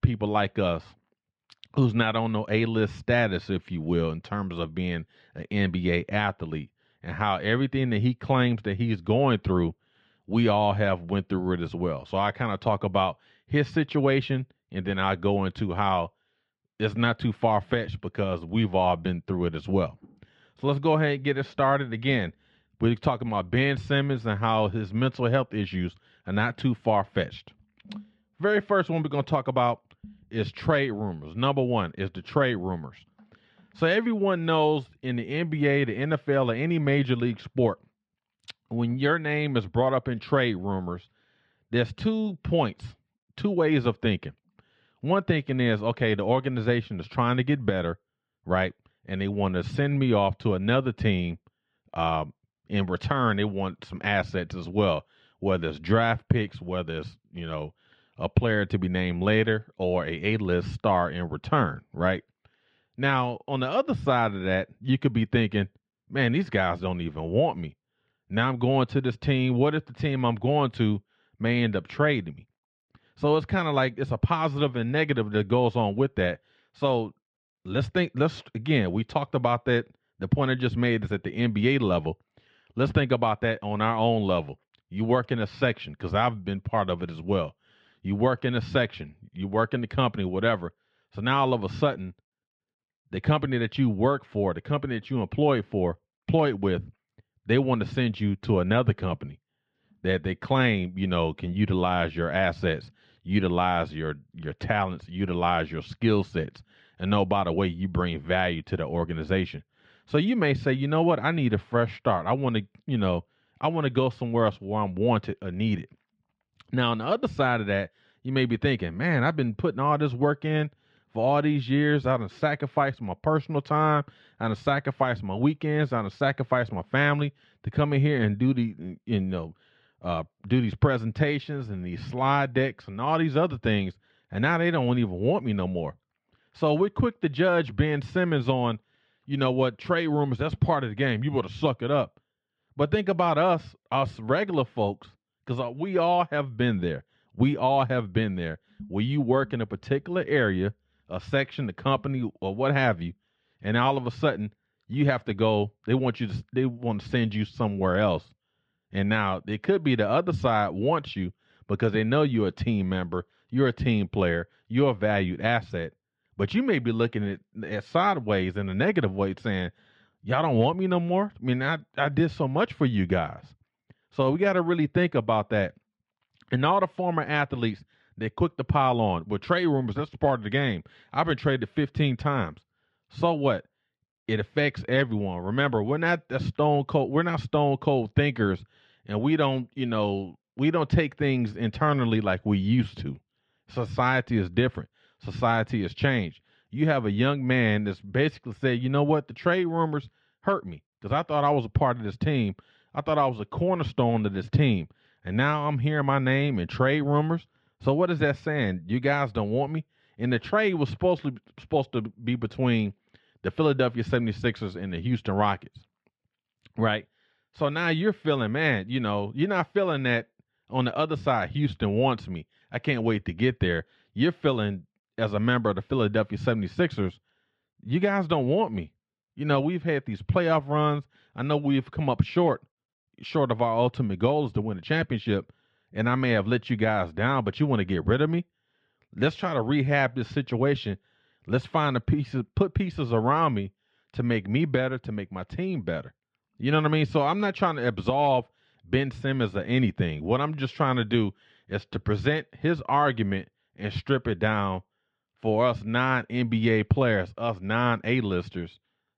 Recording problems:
muffled; slightly; fading above 3 kHz

